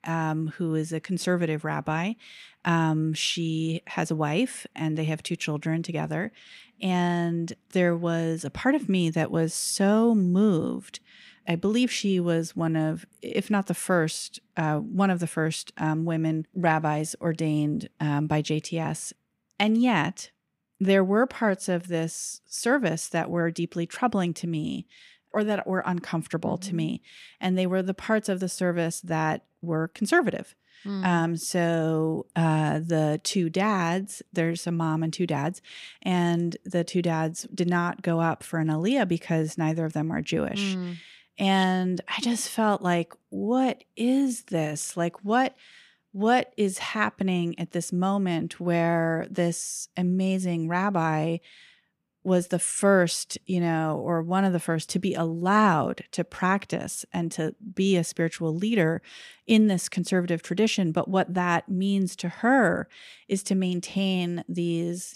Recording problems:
none

